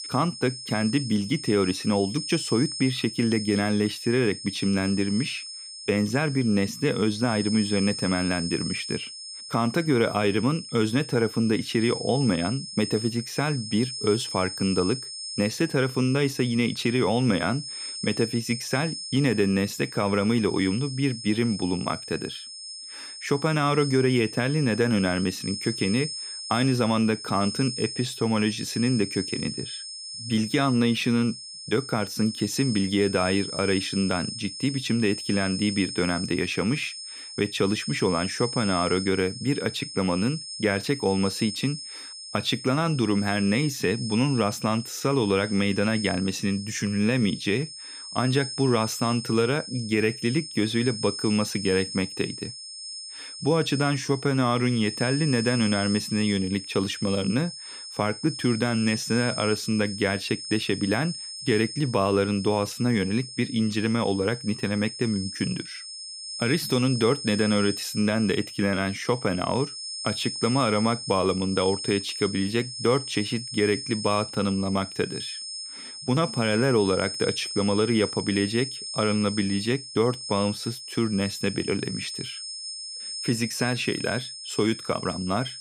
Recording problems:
high-pitched whine; loud; throughout; 5 kHz, 8 dB below the speech

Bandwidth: 15 kHz